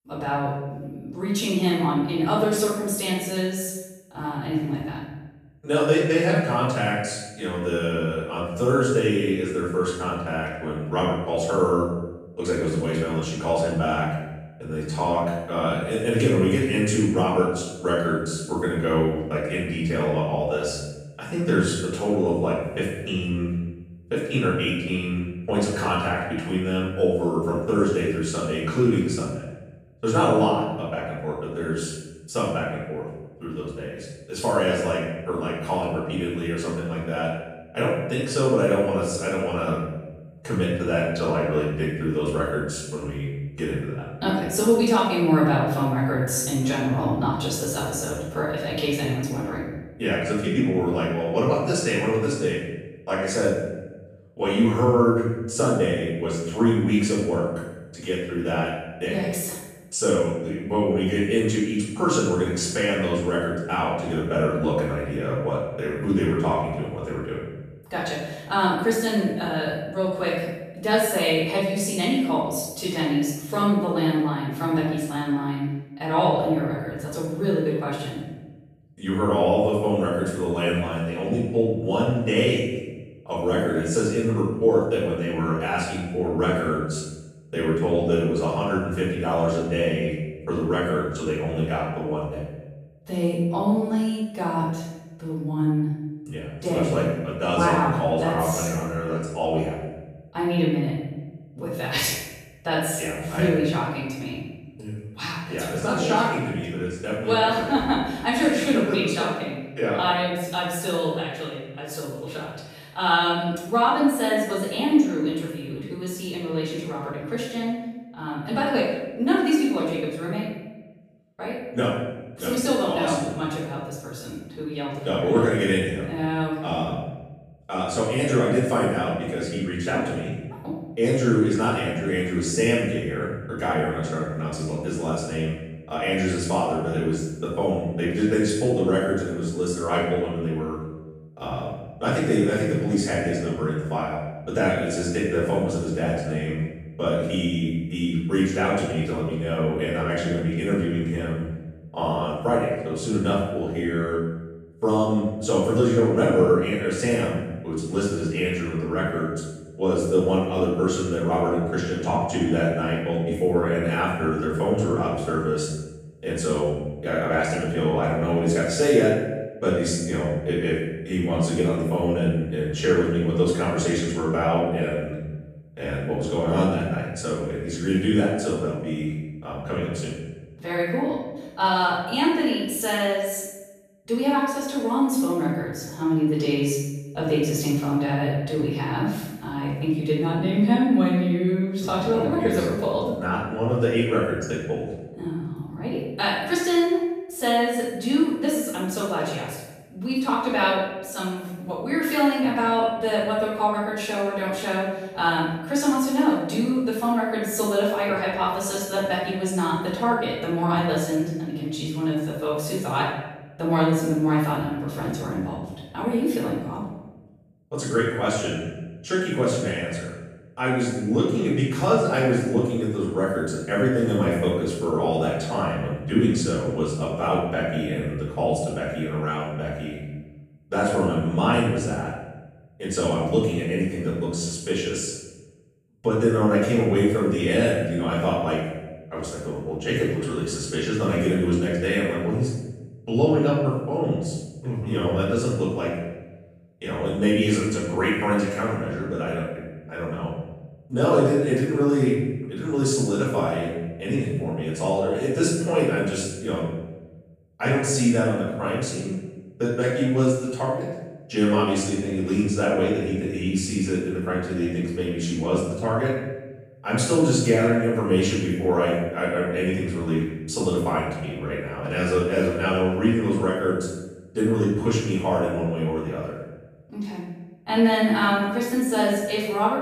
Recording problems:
room echo; strong; dies away in 1 s
off-mic speech; far

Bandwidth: 14.5 kHz